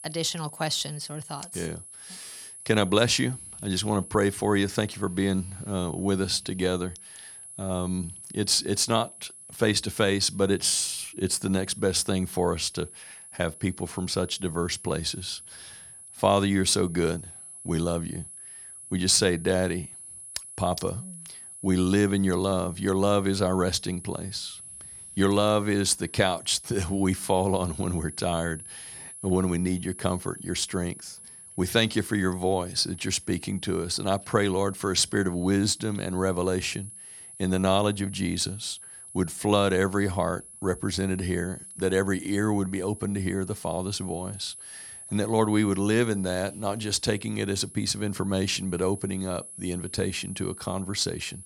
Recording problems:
high-pitched whine; noticeable; throughout; 10.5 kHz, 15 dB below the speech

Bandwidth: 17 kHz